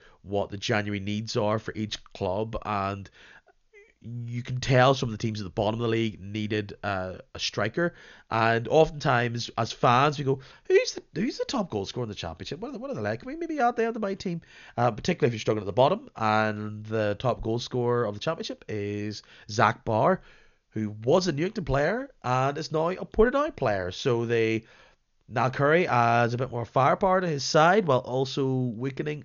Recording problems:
high frequencies cut off; noticeable; nothing above 7 kHz

